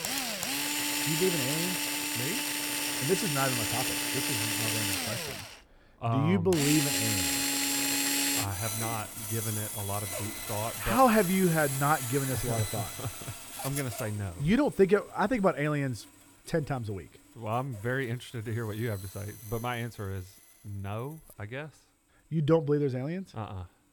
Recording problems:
machinery noise; very loud; throughout; 1 dB above the speech

